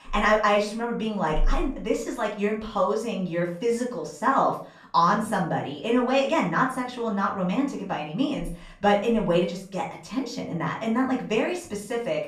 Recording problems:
off-mic speech; far
room echo; slight; dies away in 0.4 s

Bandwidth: 14.5 kHz